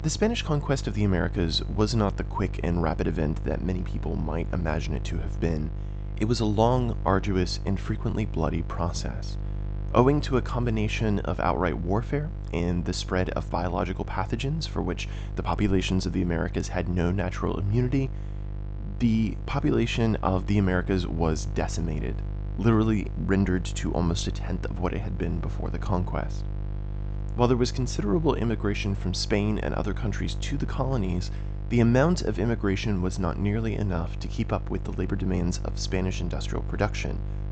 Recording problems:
high frequencies cut off; noticeable; nothing above 8 kHz
electrical hum; noticeable; throughout; 50 Hz, 15 dB below the speech

